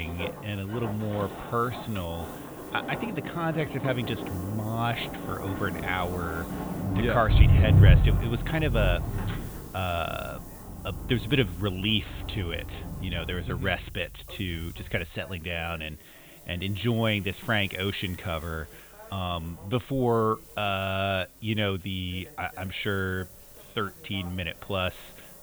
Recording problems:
high frequencies cut off; severe; nothing above 4 kHz
traffic noise; very loud; throughout; 1 dB above the speech
hiss; noticeable; throughout; 20 dB below the speech
voice in the background; faint; throughout; 25 dB below the speech
abrupt cut into speech; at the start

